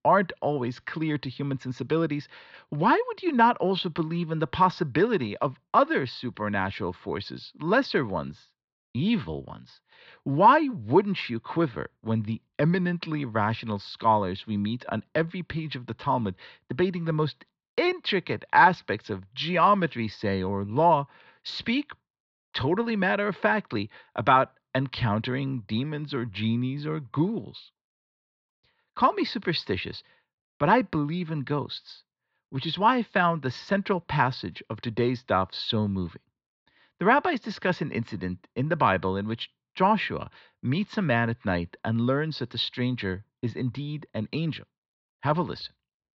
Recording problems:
muffled; very slightly; fading above 4 kHz
high frequencies cut off; slight; nothing above 7.5 kHz

